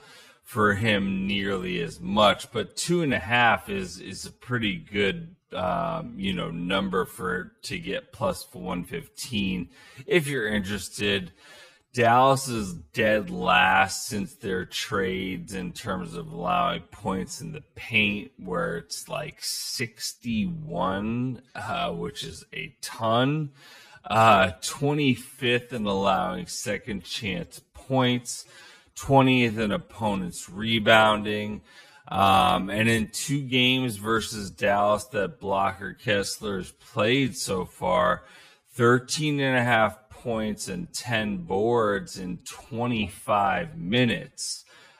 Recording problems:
wrong speed, natural pitch; too slow; 0.5 times normal speed

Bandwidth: 15 kHz